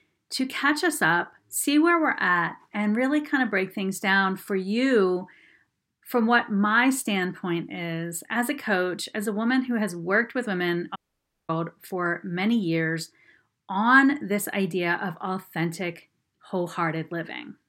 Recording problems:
audio cutting out; at 11 s for 0.5 s

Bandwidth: 16 kHz